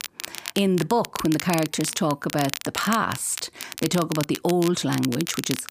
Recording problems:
crackle, like an old record; loud; 9 dB below the speech

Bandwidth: 15 kHz